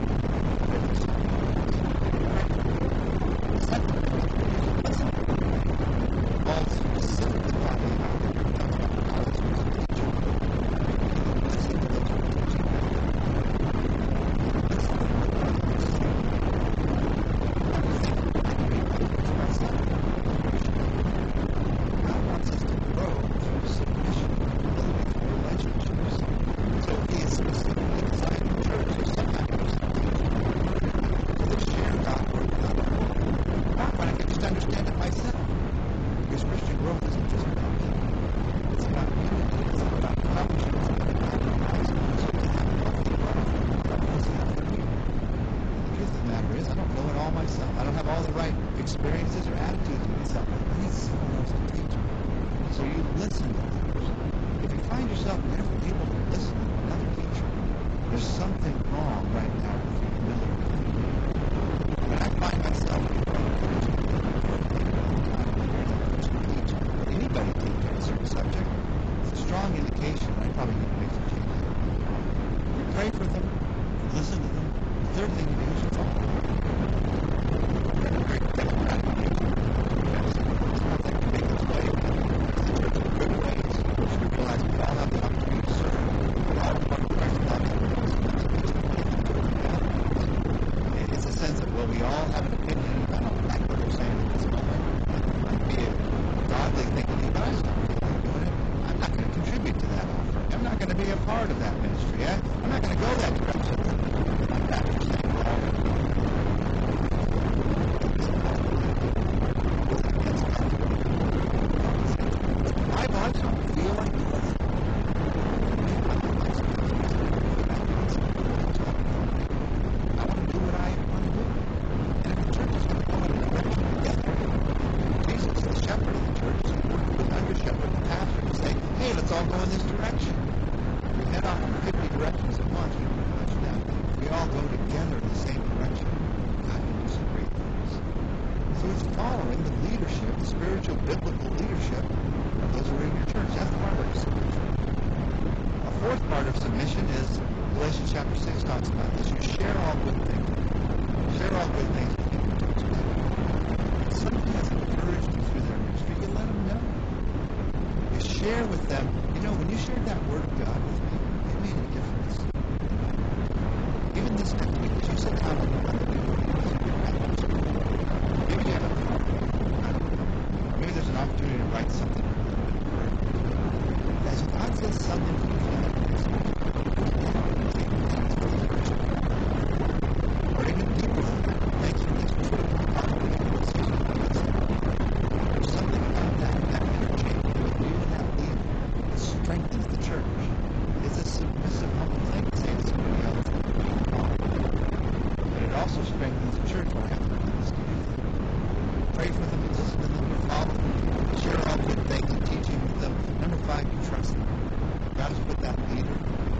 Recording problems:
distortion; heavy; 43% of the sound clipped
garbled, watery; badly; nothing above 7.5 kHz
wind noise on the microphone; heavy; 2 dB above the speech
traffic noise; noticeable; until 2:31; 20 dB below the speech

